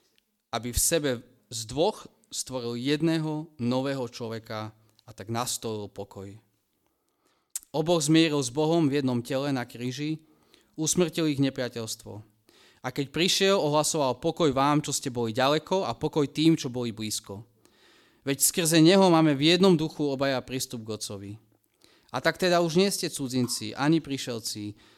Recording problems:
none

